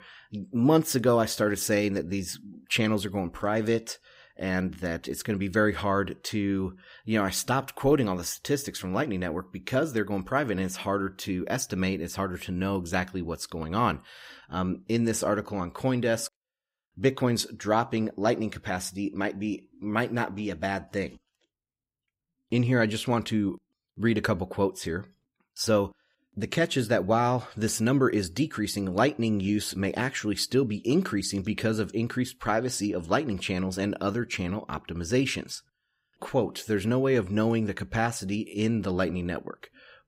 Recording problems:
none

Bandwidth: 15.5 kHz